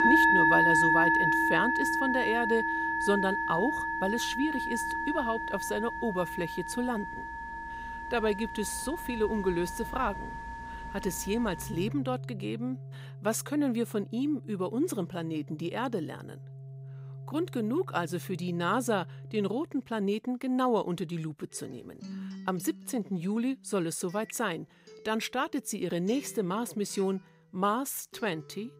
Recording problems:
background music; very loud; throughout; 2 dB above the speech

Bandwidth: 15.5 kHz